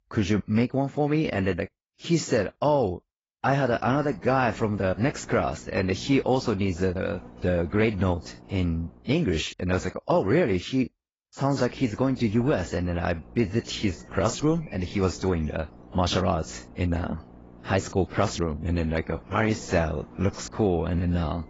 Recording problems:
garbled, watery; badly; nothing above 7.5 kHz
electrical hum; faint; from 3.5 to 9 s and from 12 s on; 60 Hz, 25 dB below the speech

